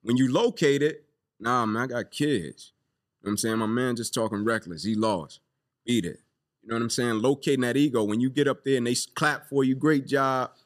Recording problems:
none

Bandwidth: 14.5 kHz